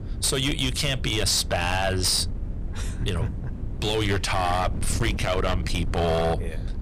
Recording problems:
distortion; slight; 12% of the sound clipped
wind noise on the microphone; occasional gusts; 15 dB below the speech

